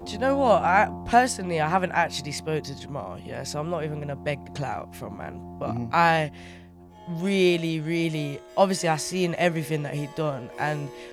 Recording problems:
background music; noticeable; throughout; 15 dB below the speech

